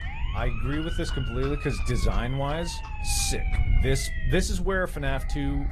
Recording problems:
garbled, watery; slightly; nothing above 13.5 kHz
wind noise on the microphone; occasional gusts; 20 dB below the speech
animal sounds; faint; throughout; 20 dB below the speech
siren; noticeable; until 4.5 s; peak 8 dB below the speech

